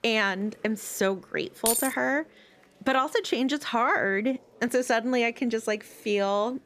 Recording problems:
chatter from many people; faint; throughout; 30 dB below the speech
jangling keys; loud; at 1.5 s; peak 1 dB above the speech

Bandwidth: 14.5 kHz